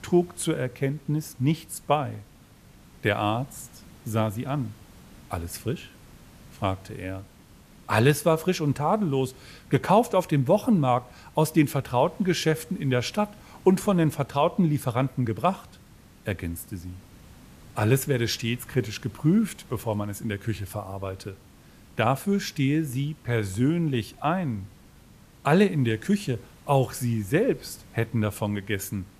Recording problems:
hiss; faint; throughout; 25 dB below the speech

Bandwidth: 14.5 kHz